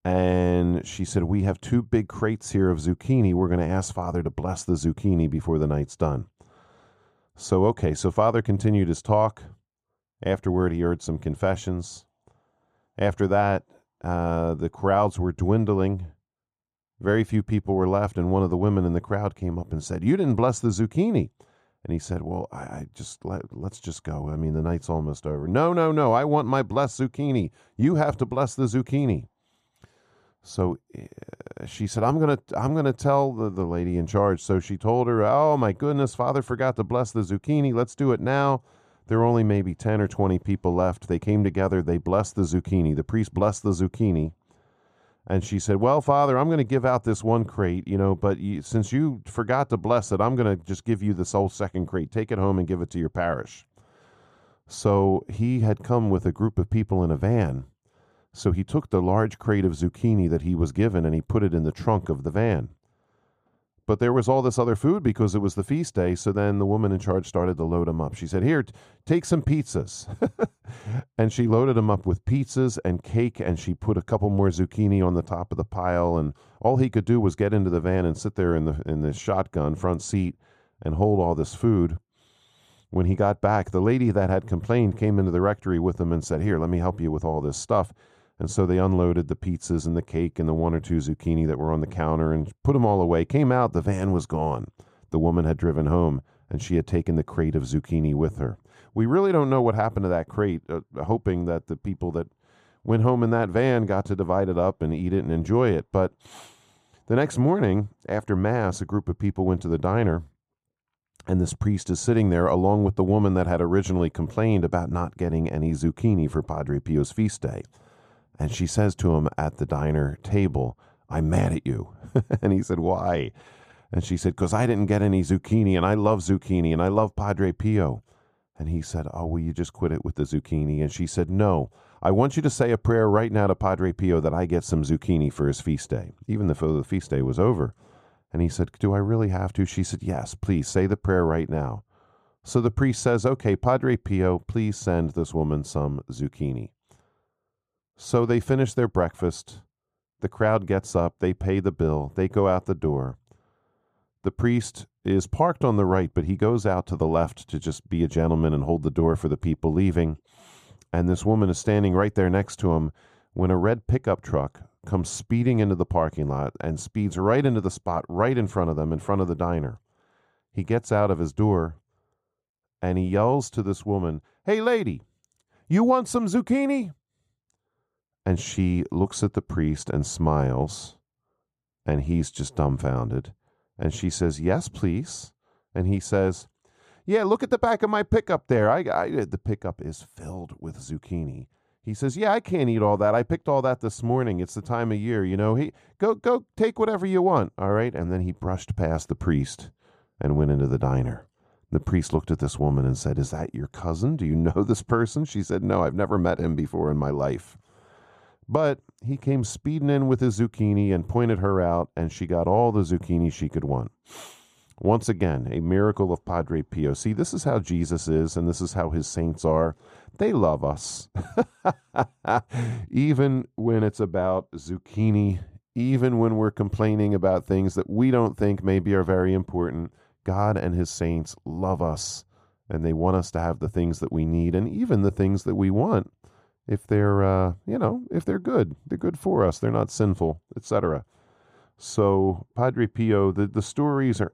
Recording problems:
muffled; slightly; fading above 1.5 kHz

